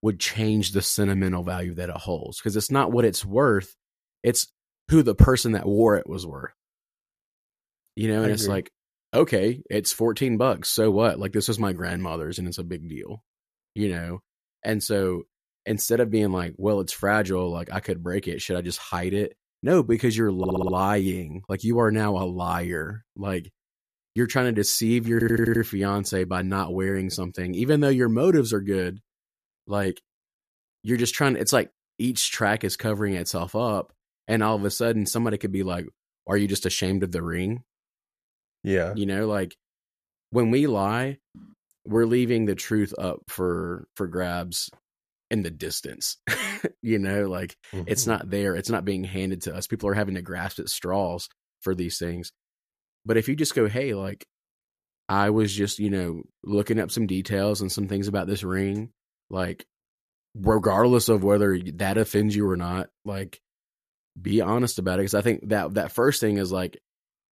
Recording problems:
audio stuttering; at 20 s and at 25 s

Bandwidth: 14.5 kHz